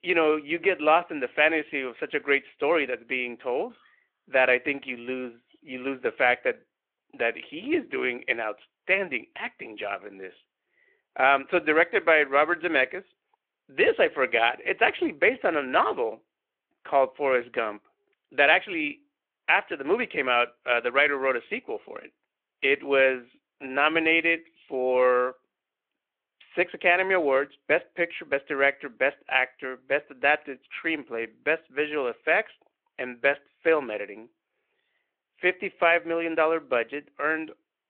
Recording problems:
phone-call audio

